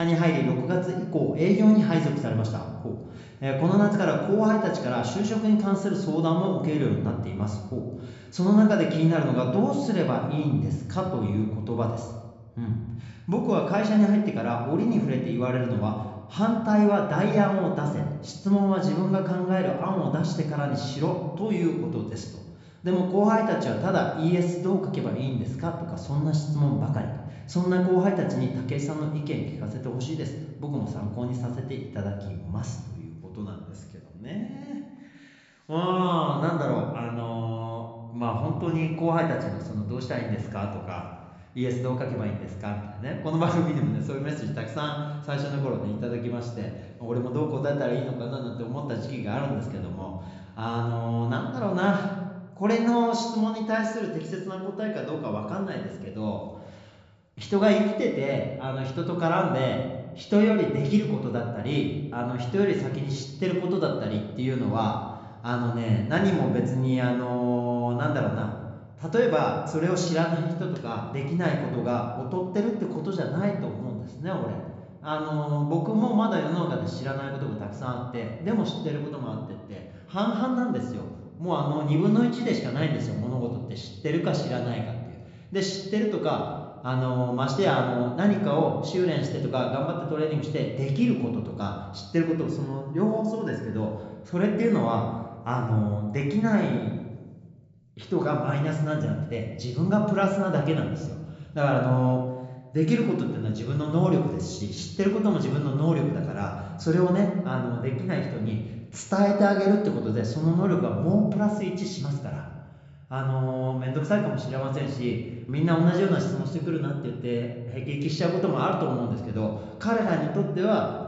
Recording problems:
high frequencies cut off; noticeable; nothing above 8 kHz
room echo; slight; dies away in 1 s
off-mic speech; somewhat distant
abrupt cut into speech; at the start

